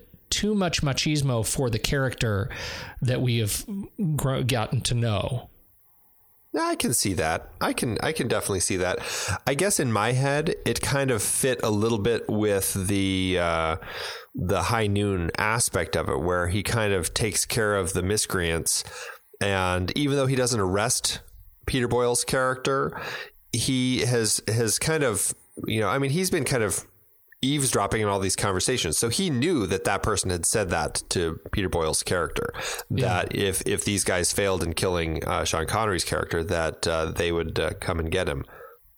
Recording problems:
squashed, flat; heavily

